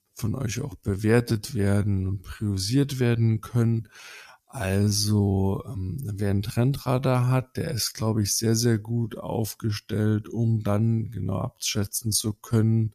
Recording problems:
wrong speed, natural pitch; too slow; 0.6 times normal speed

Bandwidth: 14.5 kHz